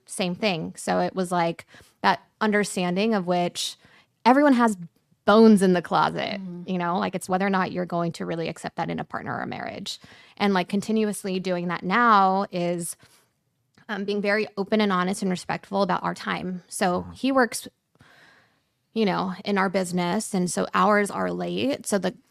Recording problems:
uneven, jittery; strongly; from 4 to 14 s

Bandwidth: 14.5 kHz